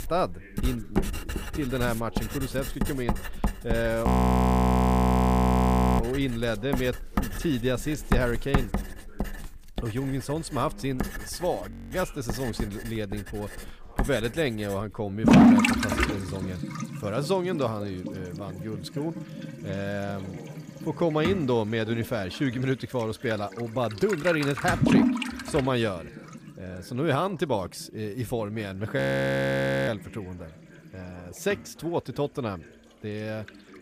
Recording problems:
distortion; slight; 0.4% of the sound clipped
household noises; very loud; throughout; 3 dB above the speech
voice in the background; faint; throughout; 20 dB below the speech
audio freezing; at 4 s for 2 s, at 12 s and at 29 s for 1 s

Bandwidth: 15 kHz